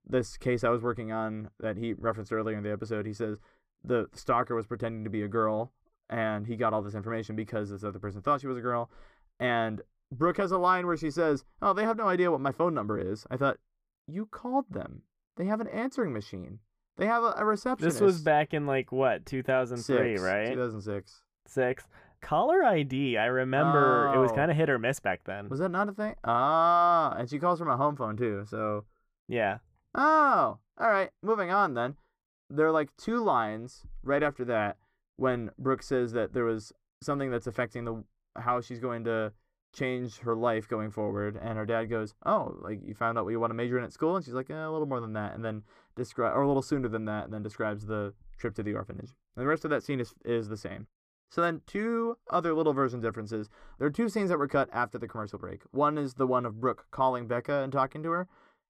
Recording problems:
muffled; slightly; fading above 2.5 kHz

